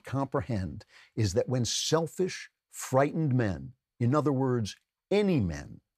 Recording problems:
none

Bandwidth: 14.5 kHz